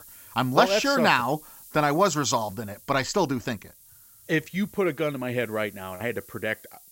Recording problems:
high frequencies cut off; noticeable; nothing above 8 kHz
hiss; faint; throughout; 20 dB below the speech

